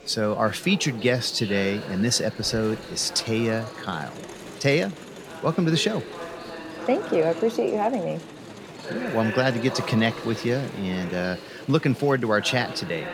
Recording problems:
chatter from many people; noticeable; throughout; 10 dB below the speech

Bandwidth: 18 kHz